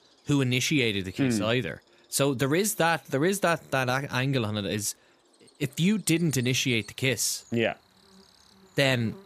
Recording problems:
animal sounds; faint; throughout; 30 dB below the speech

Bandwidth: 14.5 kHz